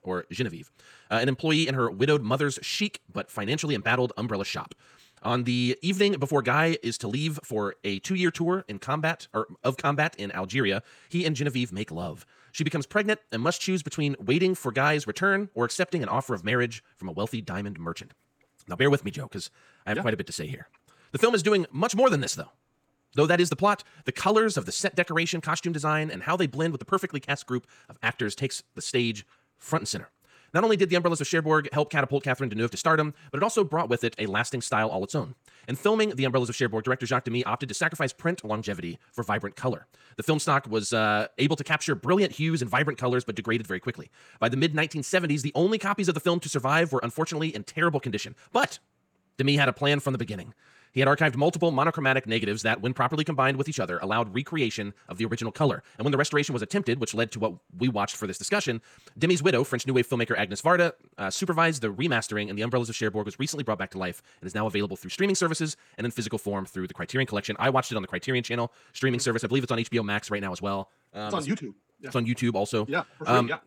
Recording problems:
wrong speed, natural pitch; too fast; 1.5 times normal speed

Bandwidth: 18.5 kHz